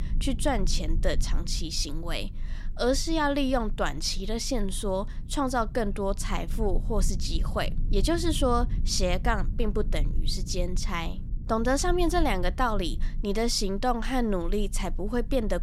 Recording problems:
low rumble; faint; throughout; 20 dB below the speech

